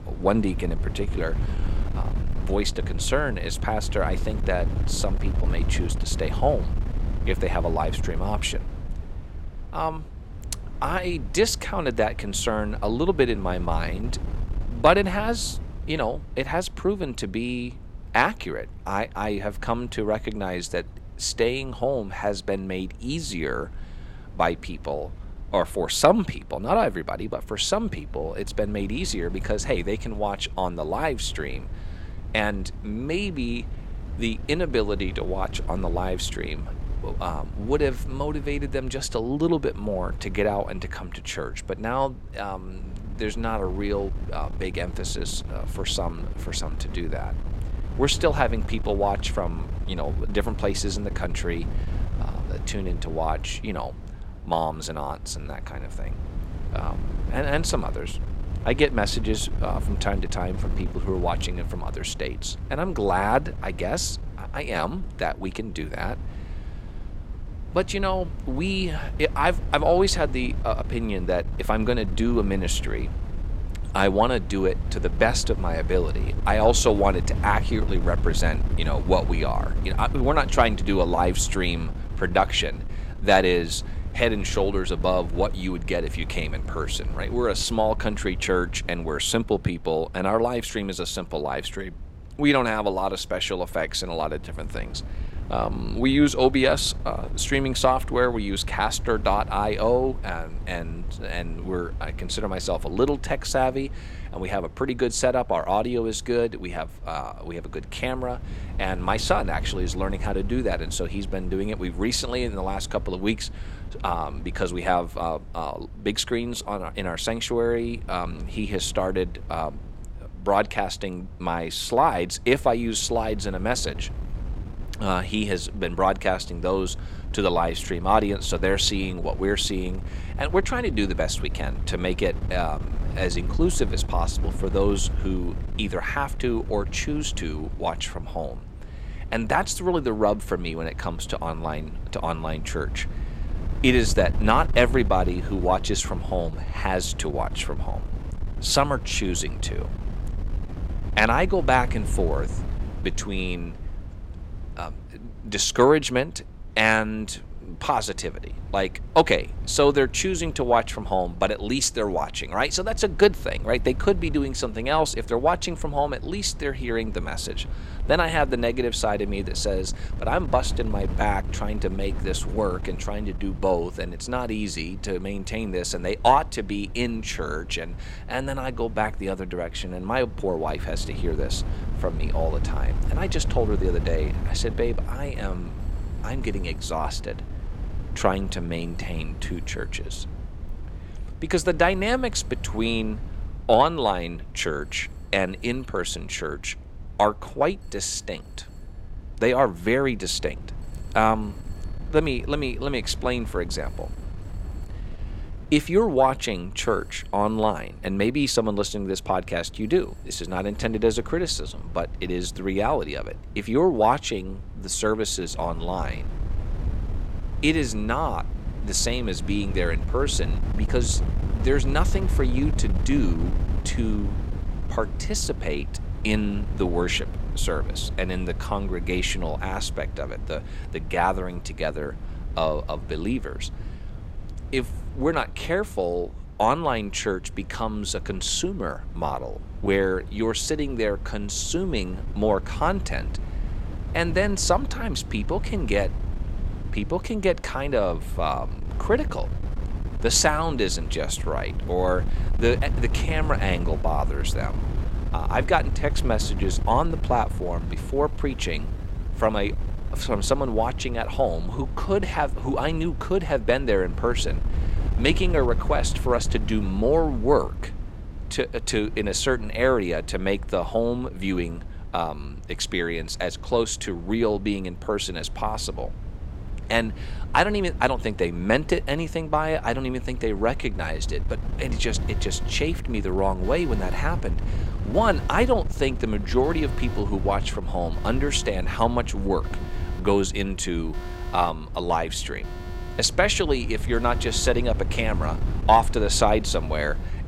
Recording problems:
wind noise on the microphone; occasional gusts; 20 dB below the speech
alarms or sirens; faint; throughout; 25 dB below the speech

